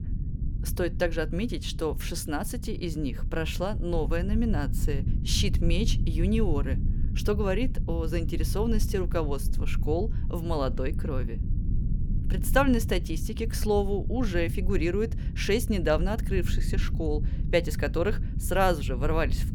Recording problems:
low rumble; noticeable; throughout; 15 dB below the speech

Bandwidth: 18.5 kHz